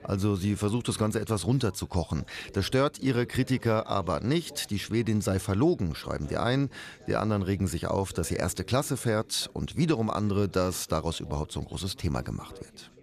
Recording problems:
background chatter; faint; throughout; 4 voices, 25 dB below the speech

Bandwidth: 14 kHz